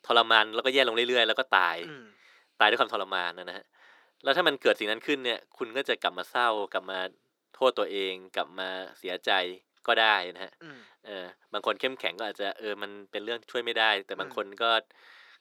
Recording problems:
thin; very; fading below 300 Hz

